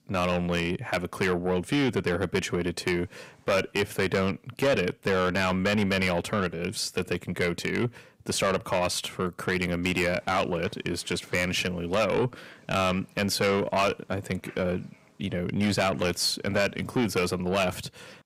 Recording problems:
distortion; heavy; 7 dB below the speech

